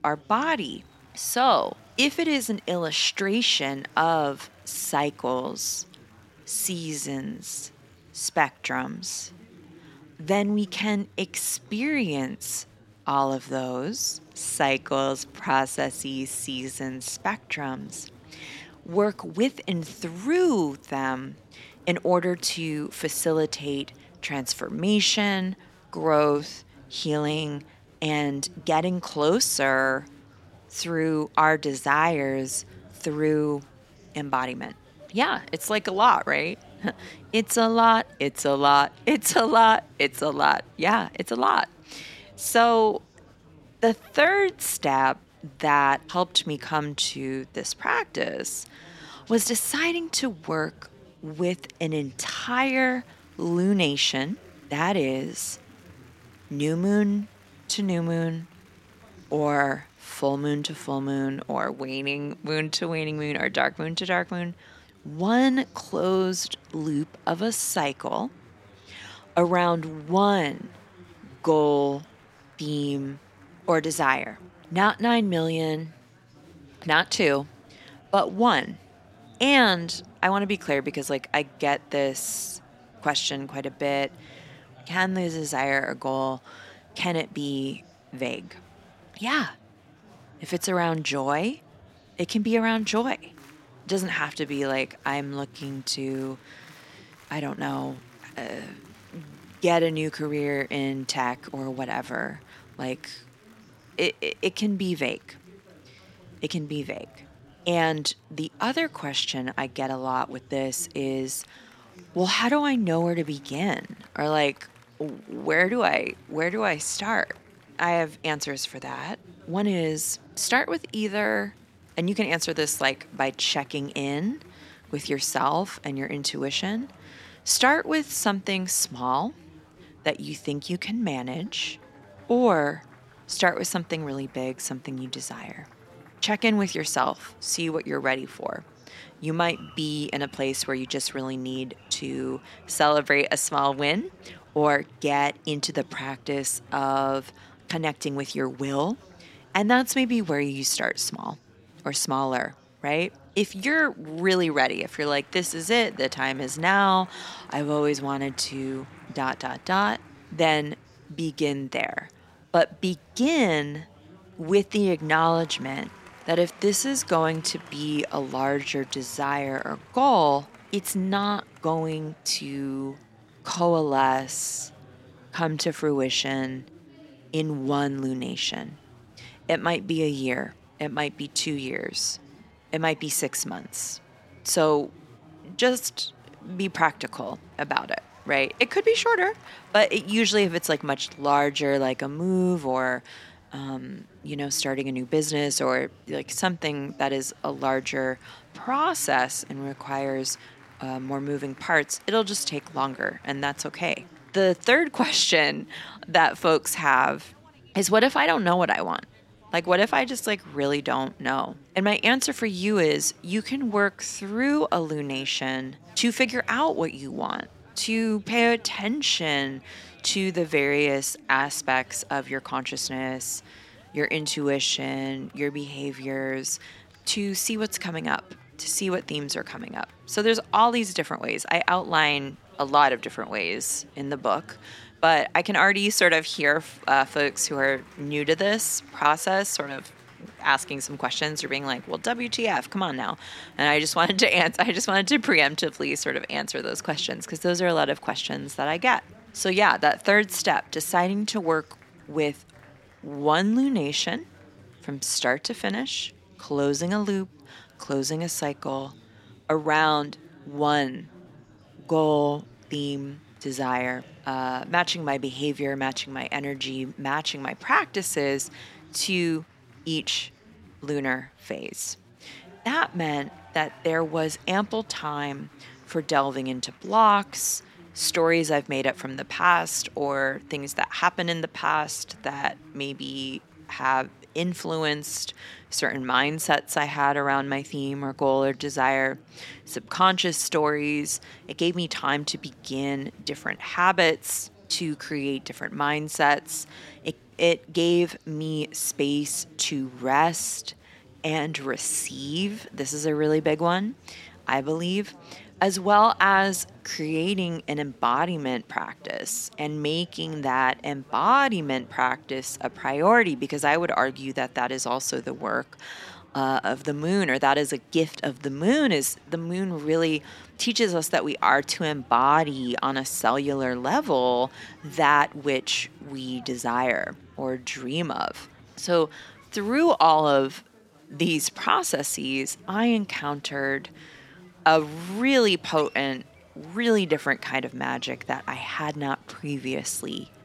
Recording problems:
chatter from many people; faint; throughout; 25 dB below the speech

